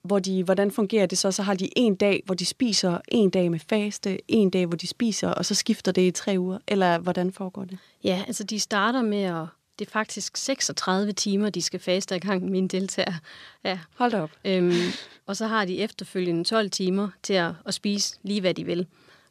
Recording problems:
none

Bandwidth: 14.5 kHz